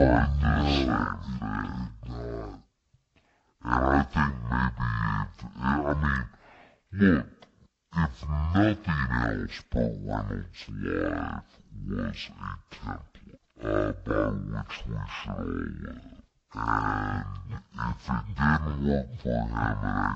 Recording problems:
wrong speed and pitch; too slow and too low; 0.5 times normal speed
garbled, watery; slightly; nothing above 8 kHz
abrupt cut into speech; at the start and the end

